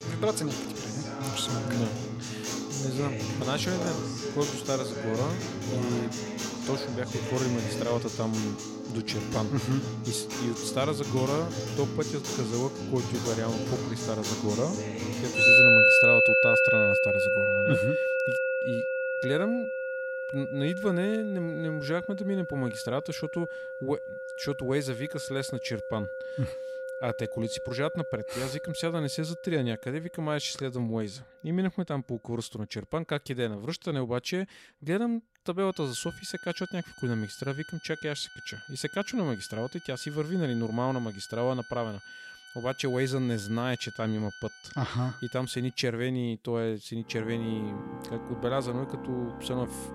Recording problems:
background music; very loud; throughout; 5 dB above the speech

